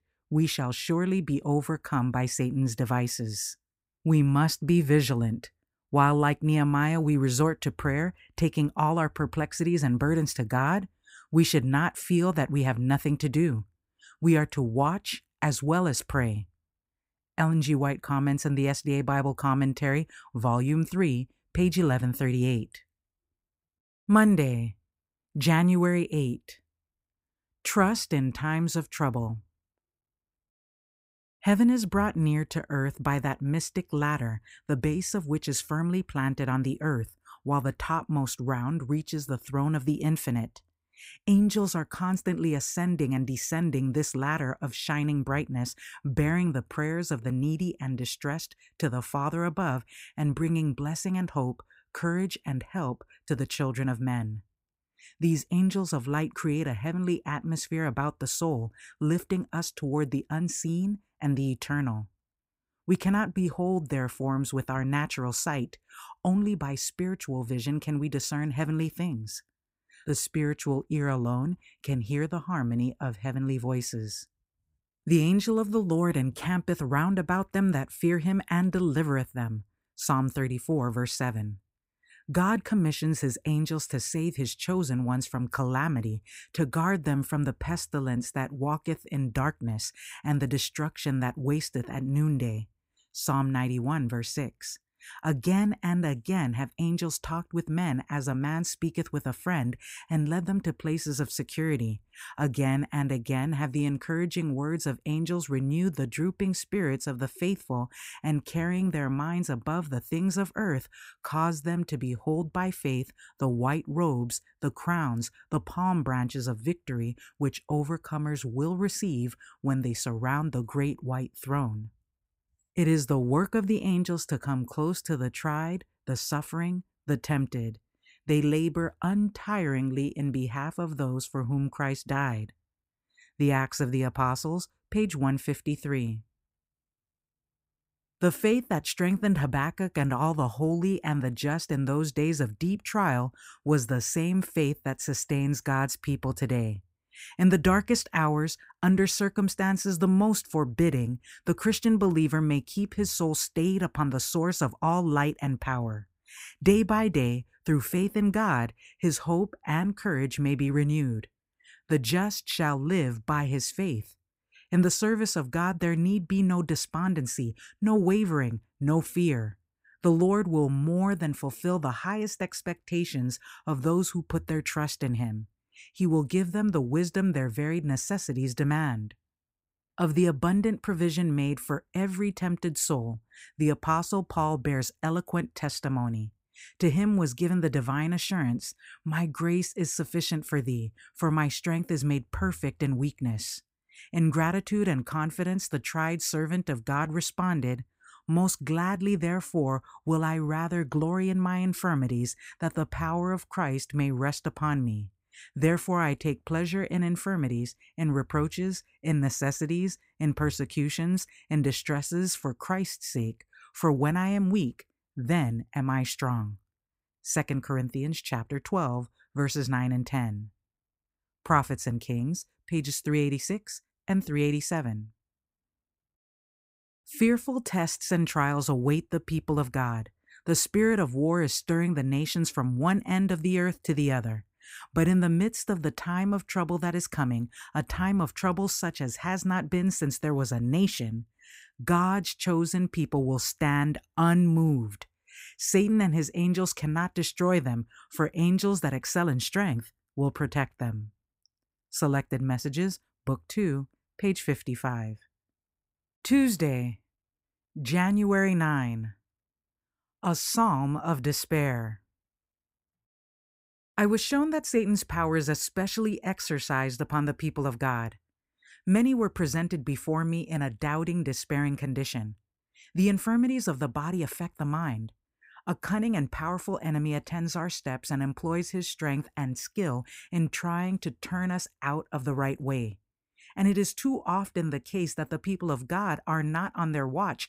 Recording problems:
none

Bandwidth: 15.5 kHz